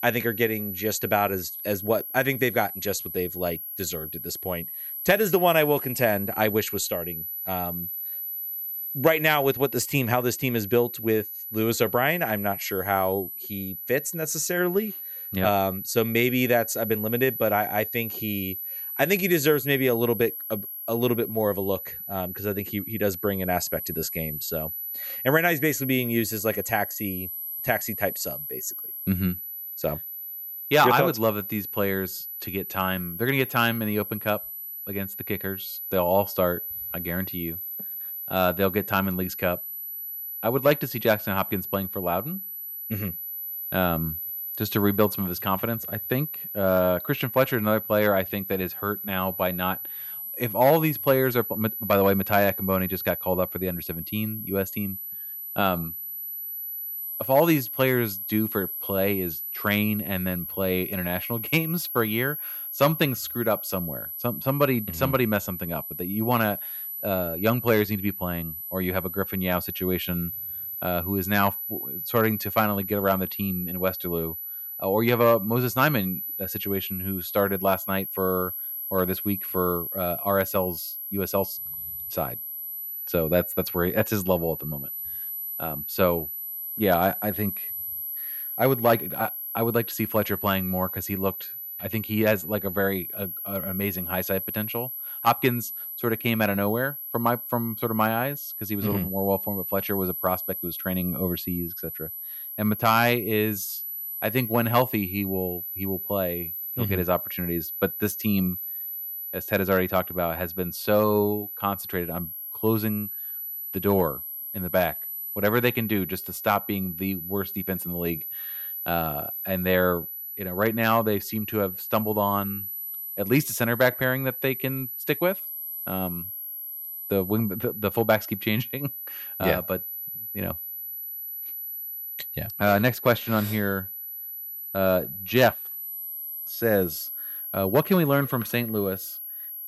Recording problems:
high-pitched whine; loud; throughout; 12 kHz, 5 dB below the speech

